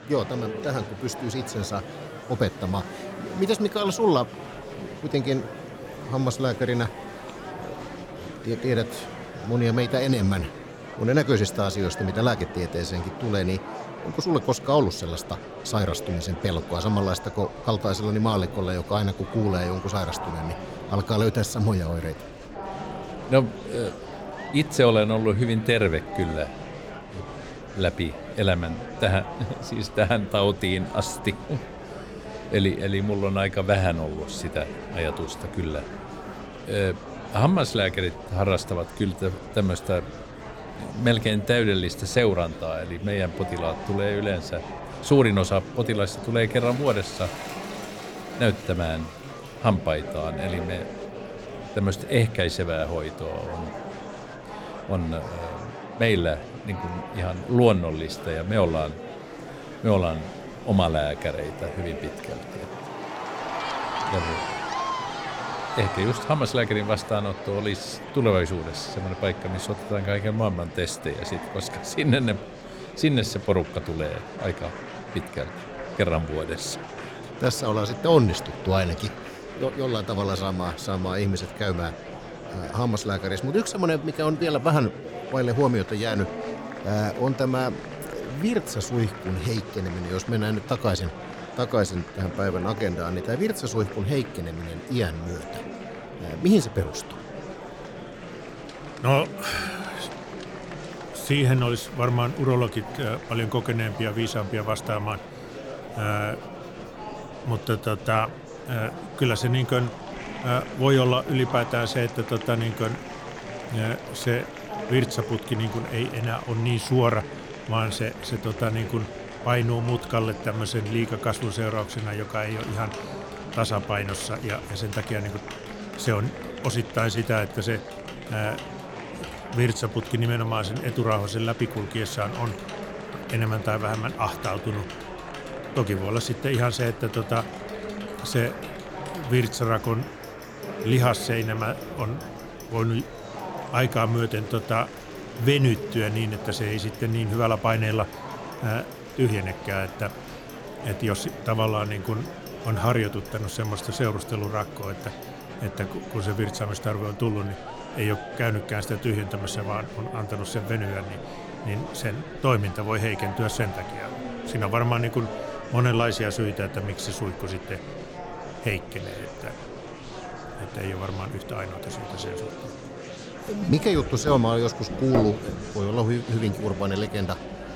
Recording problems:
household noises; noticeable; throughout; 20 dB below the speech
murmuring crowd; noticeable; throughout; 10 dB below the speech

